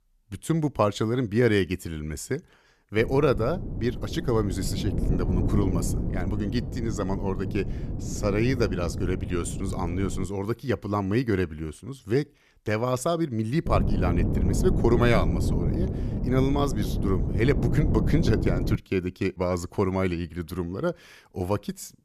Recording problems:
wind noise on the microphone; heavy; from 3 to 10 s and from 14 to 19 s; 8 dB below the speech

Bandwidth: 14.5 kHz